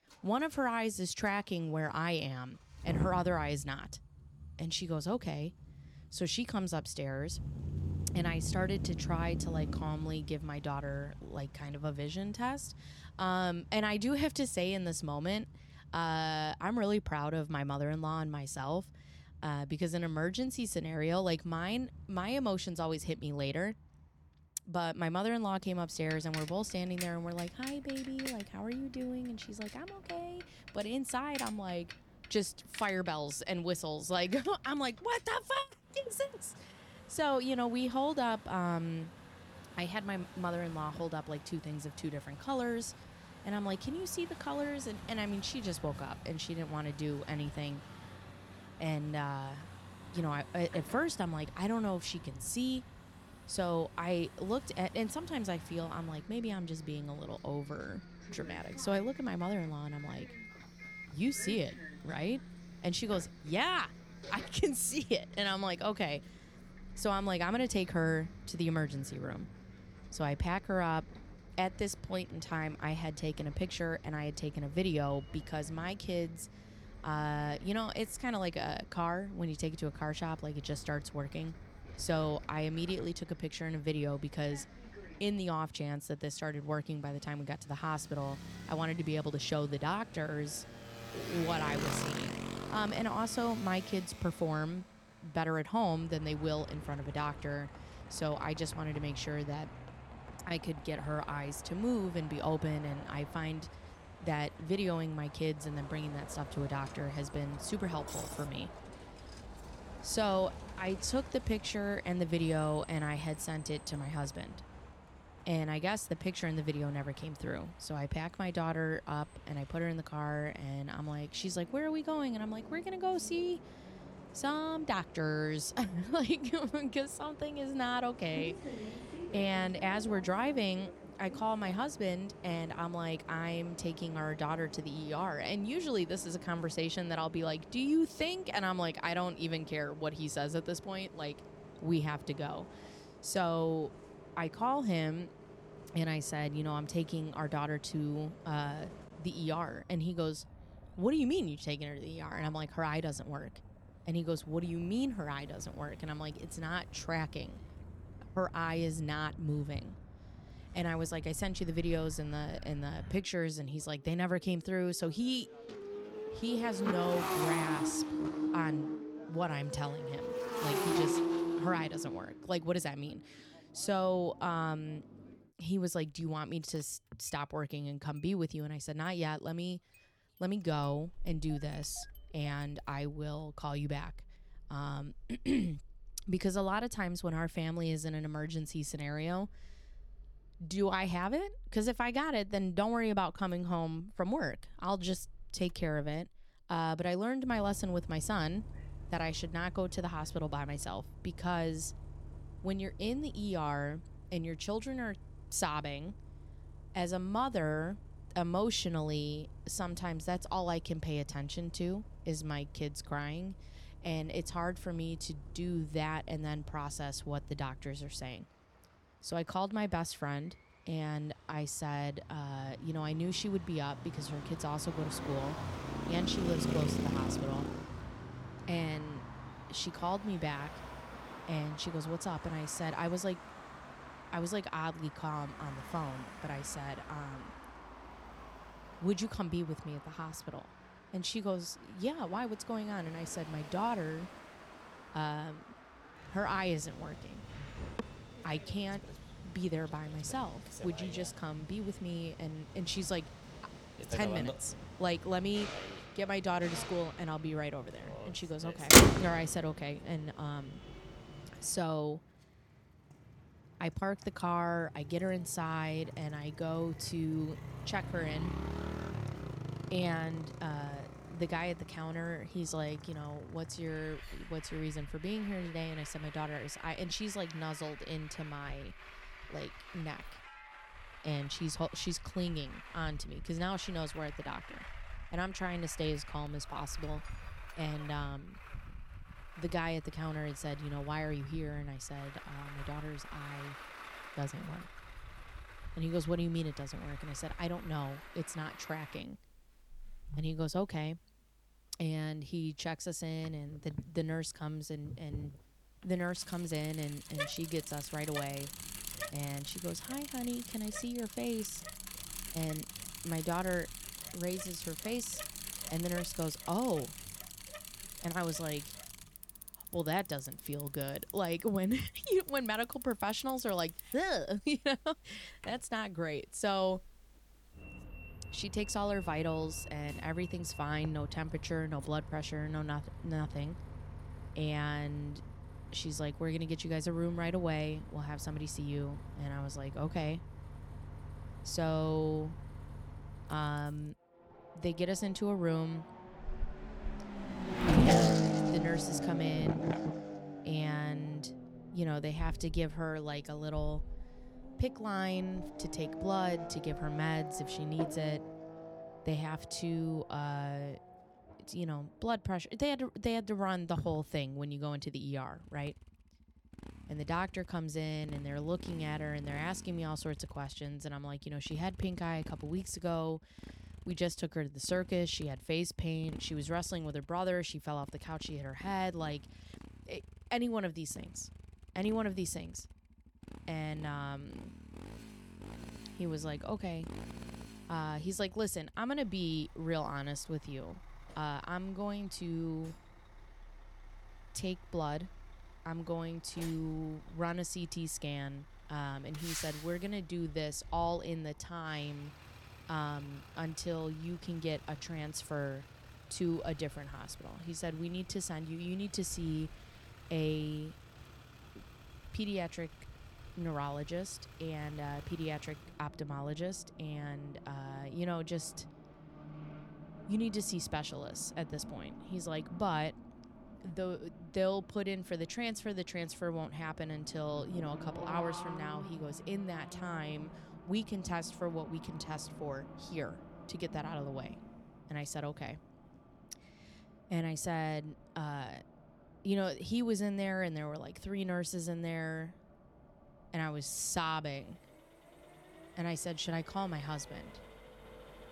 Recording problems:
traffic noise; loud; throughout; 6 dB below the speech

